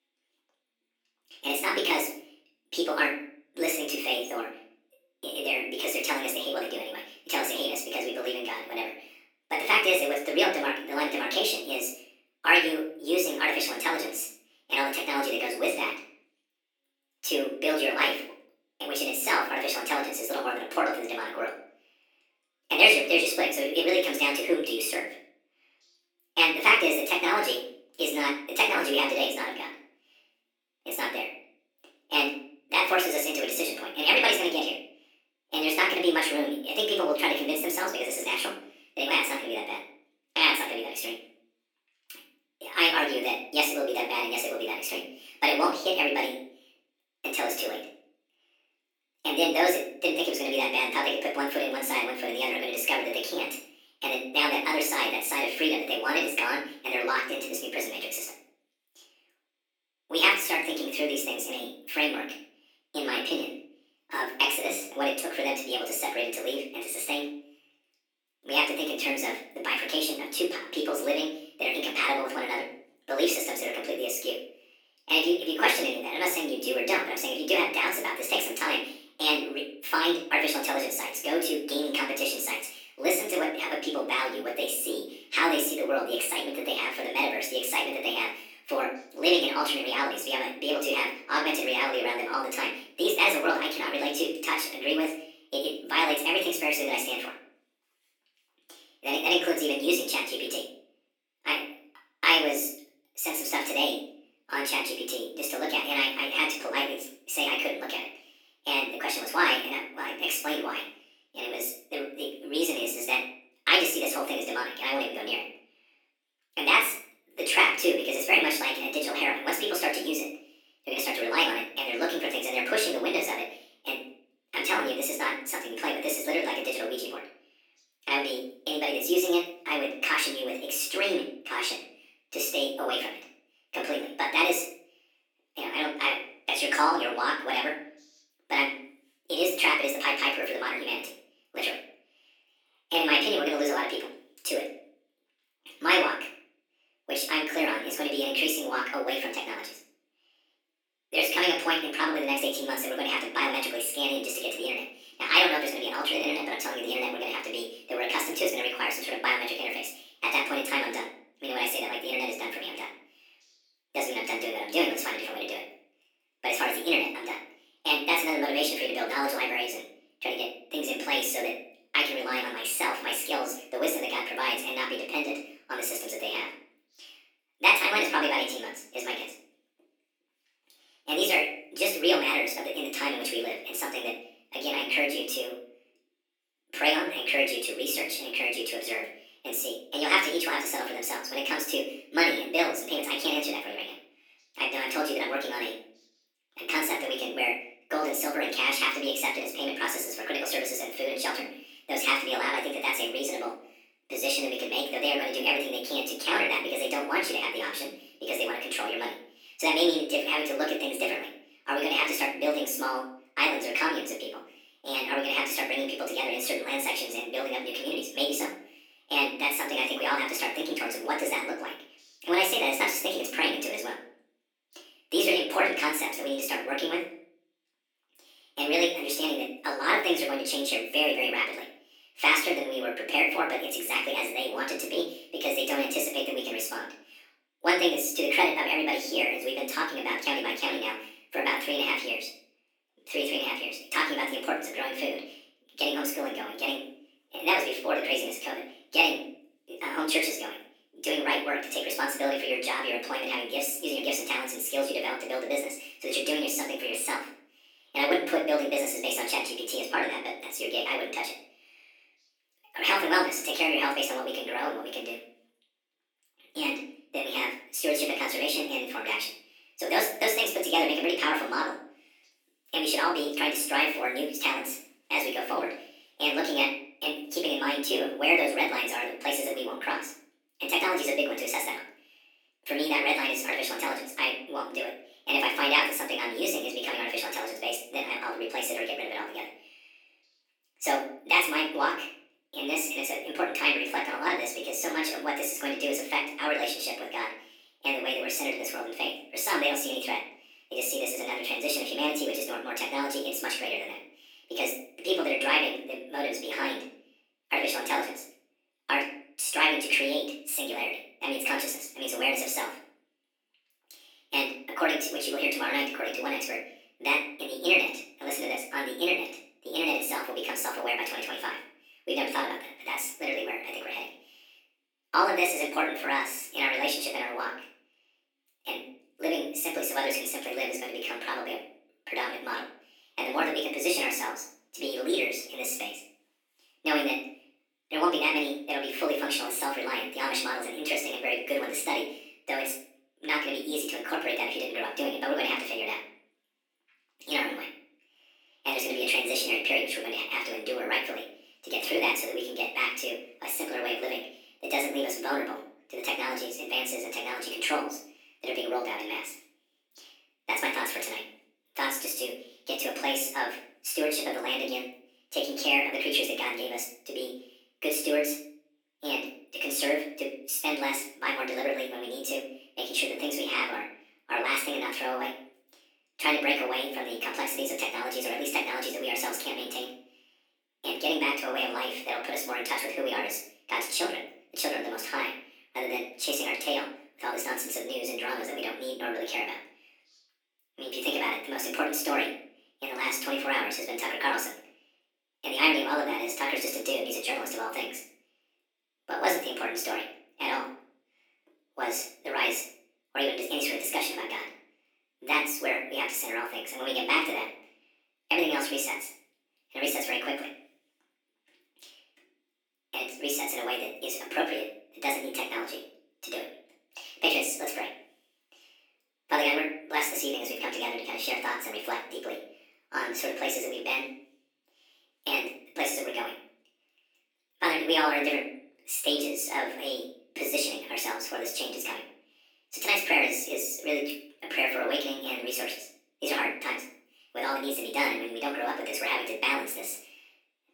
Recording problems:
off-mic speech; far
wrong speed and pitch; too fast and too high; 1.6 times normal speed
thin; somewhat; fading below 300 Hz
room echo; slight; dies away in 0.5 s

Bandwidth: 19 kHz